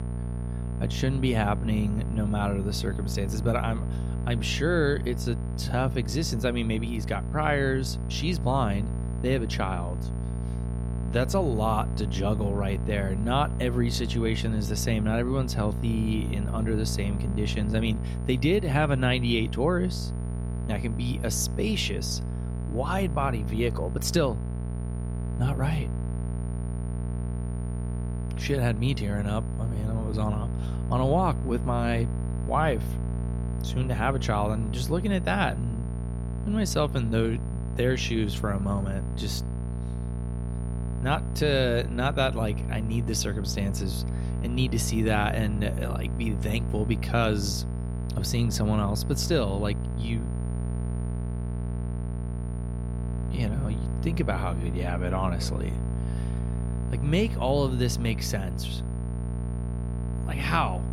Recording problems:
electrical hum; noticeable; throughout; 60 Hz, 10 dB below the speech
high-pitched whine; faint; throughout; 9.5 kHz, 25 dB below the speech

